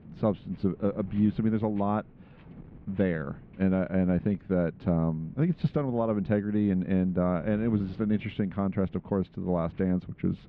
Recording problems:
muffled; very; fading above 3 kHz
wind noise on the microphone; occasional gusts; 25 dB below the speech

